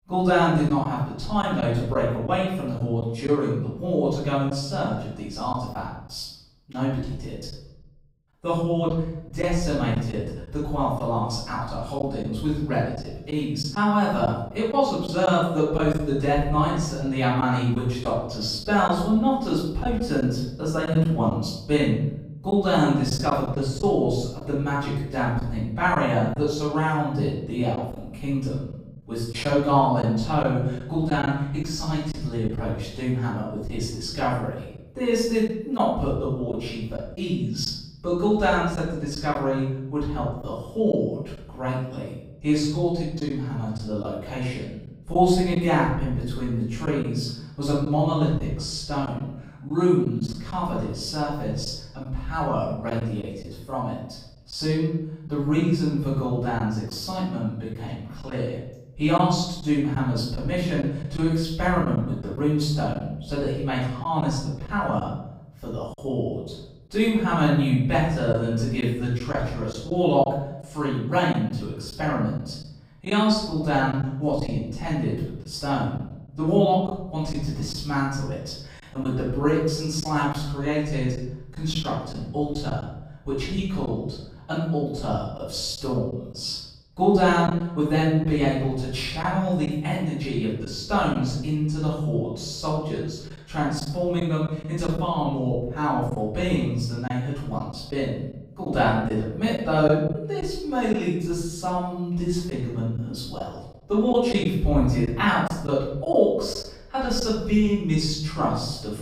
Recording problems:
off-mic speech; far
room echo; noticeable; dies away in 0.8 s
choppy; occasionally; 2% of the speech affected

